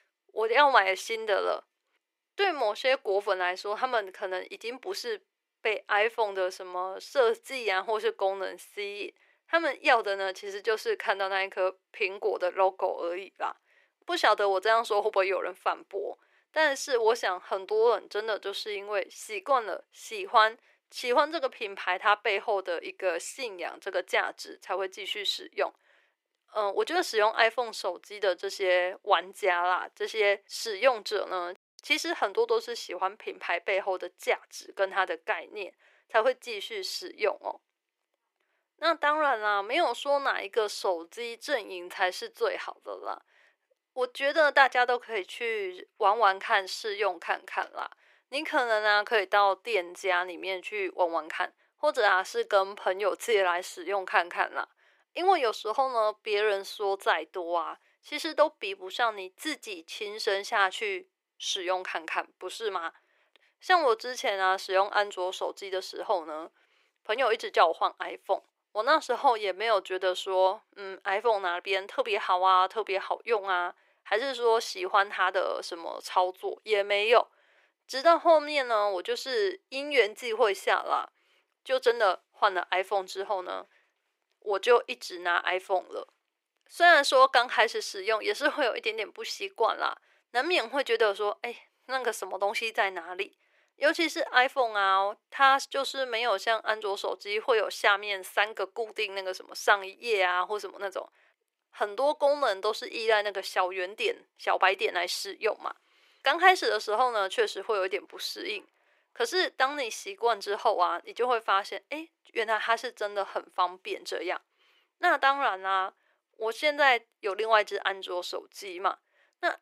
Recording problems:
thin; very; fading below 400 Hz

